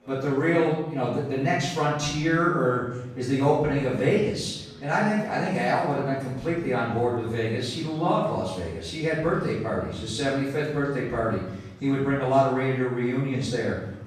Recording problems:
off-mic speech; far
room echo; noticeable; dies away in 0.8 s
chatter from many people; faint; throughout; 25 dB below the speech

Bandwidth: 14.5 kHz